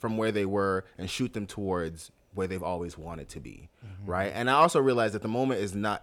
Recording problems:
none

